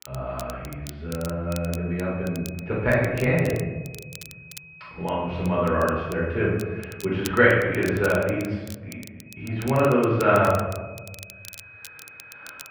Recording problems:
off-mic speech; far
muffled; very; fading above 2.5 kHz
room echo; noticeable; dies away in 1.1 s
crackle, like an old record; noticeable; 20 dB below the speech
high-pitched whine; faint; from 1.5 to 7.5 s and from 9.5 s on; 2.5 kHz, 20 dB below the speech

